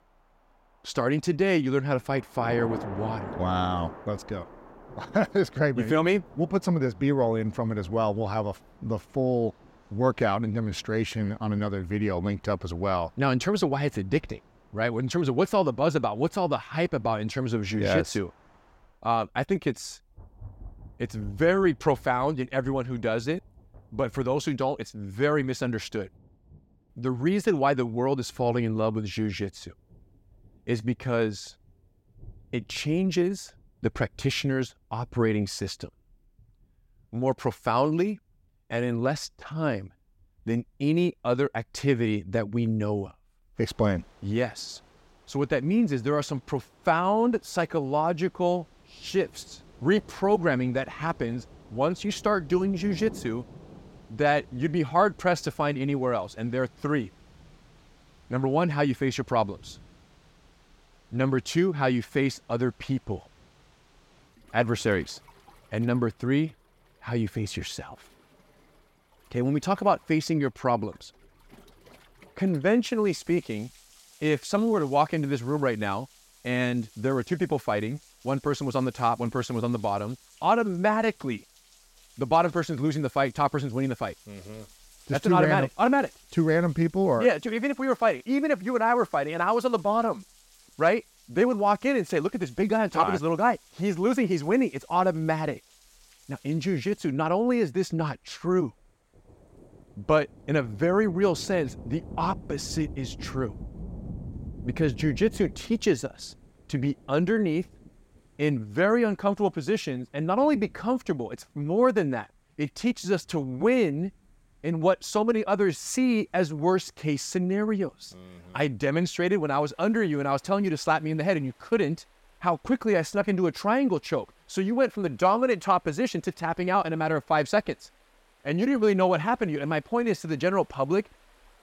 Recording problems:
rain or running water; faint; throughout; 20 dB below the speech

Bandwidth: 16 kHz